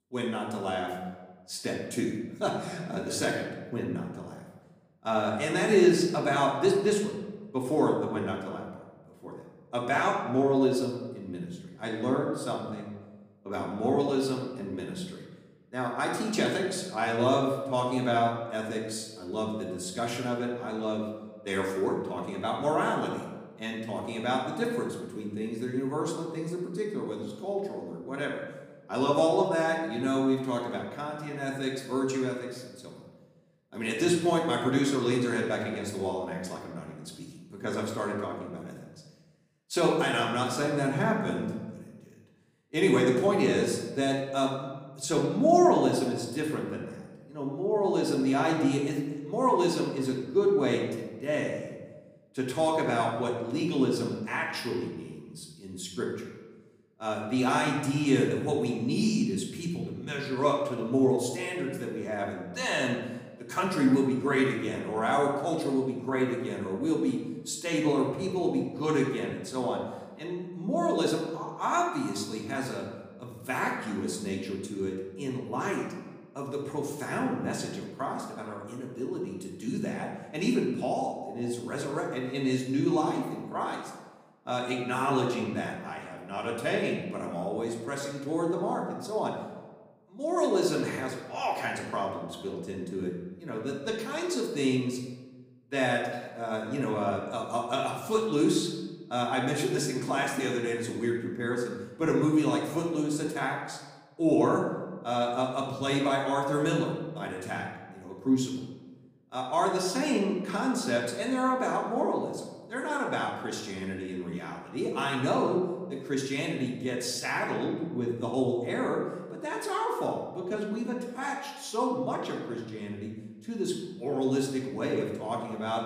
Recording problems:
off-mic speech; far
room echo; noticeable; dies away in 1 s

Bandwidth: 15.5 kHz